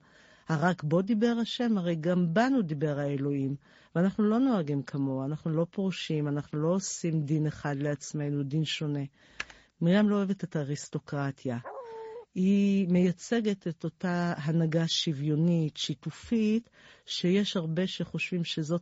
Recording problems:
garbled, watery; slightly; nothing above 7.5 kHz
high frequencies cut off; slight
keyboard typing; faint; at 9.5 s; peak 10 dB below the speech
dog barking; faint; at 12 s; peak 10 dB below the speech

